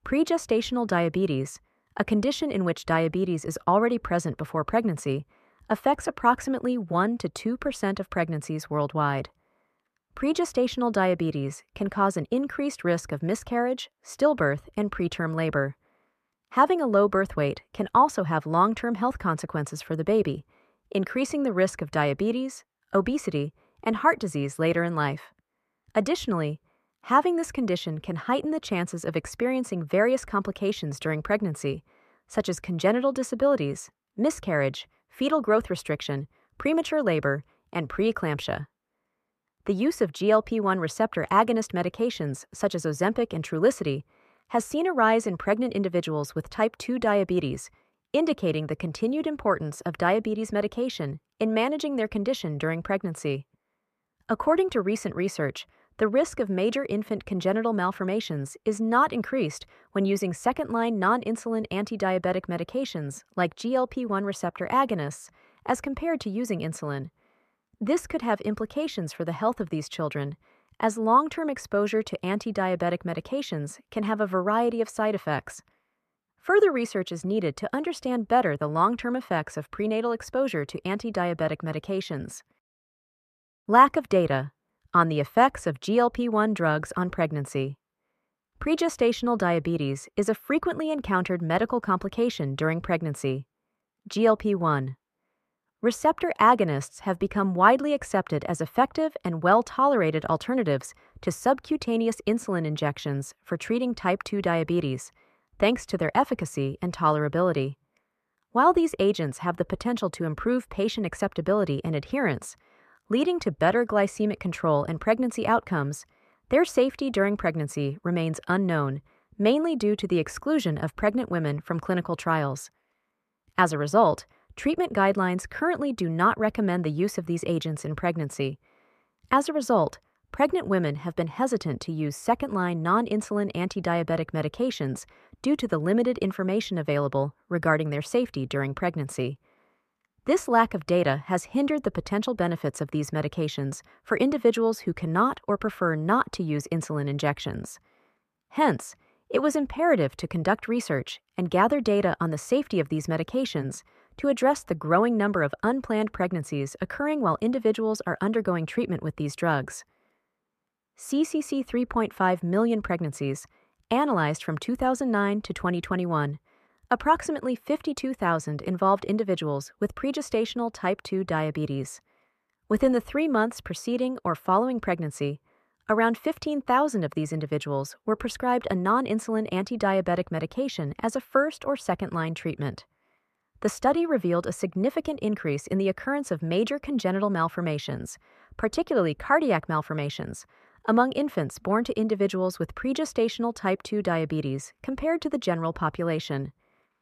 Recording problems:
muffled; slightly; fading above 3 kHz

